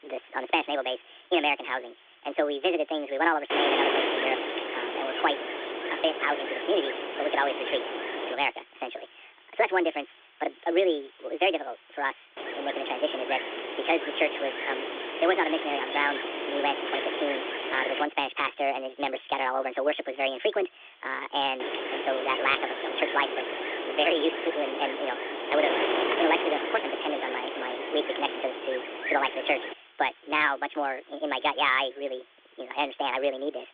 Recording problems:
wrong speed and pitch; too fast and too high; 1.5 times normal speed
phone-call audio; nothing above 3.5 kHz
wind noise on the microphone; heavy; from 3.5 to 8.5 s, from 12 to 18 s and from 22 to 30 s; 3 dB below the speech
hiss; faint; throughout; 25 dB below the speech

